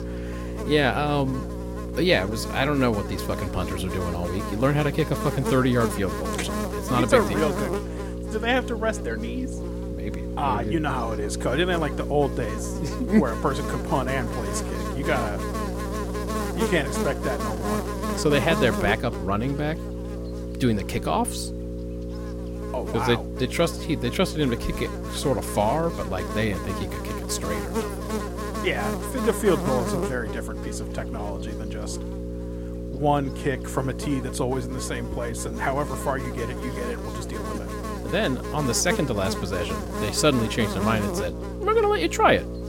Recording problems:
electrical hum; loud; throughout; 60 Hz, 7 dB below the speech

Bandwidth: 16.5 kHz